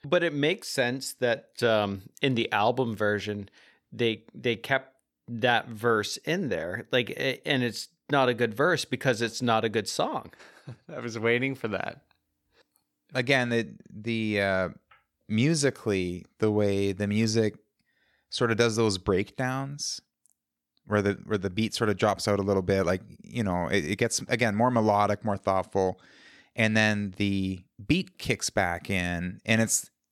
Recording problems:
none

